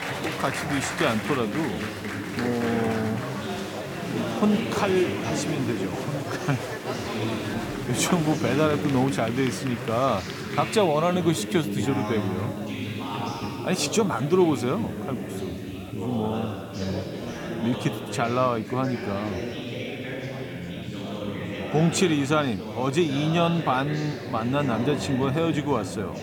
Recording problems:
chatter from many people; loud; throughout; 5 dB below the speech
hiss; faint; throughout; 25 dB below the speech

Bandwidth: 17.5 kHz